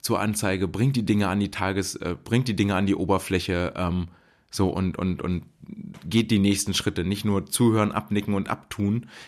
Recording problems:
none

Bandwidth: 13.5 kHz